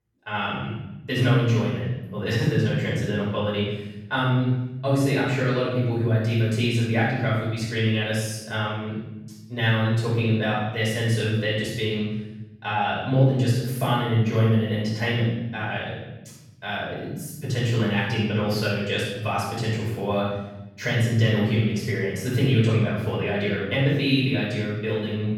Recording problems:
room echo; strong; dies away in 1.1 s
off-mic speech; far

